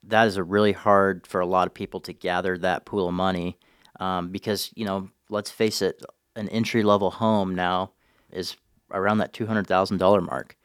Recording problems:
none

